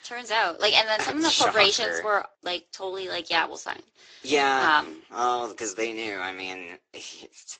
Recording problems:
thin; somewhat; fading below 300 Hz
garbled, watery; slightly; nothing above 7.5 kHz

